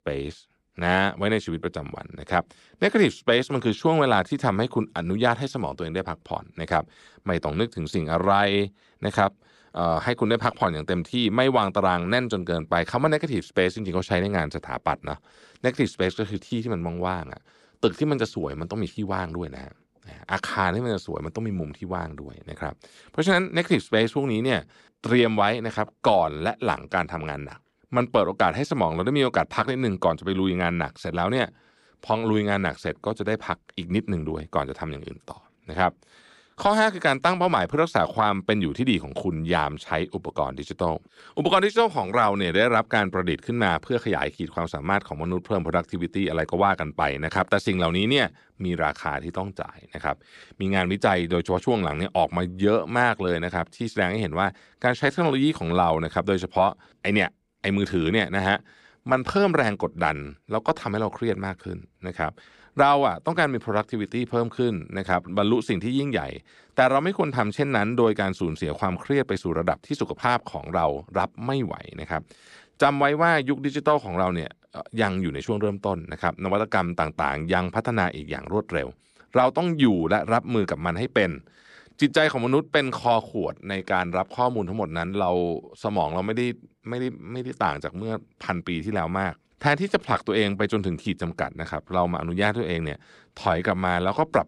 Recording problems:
none

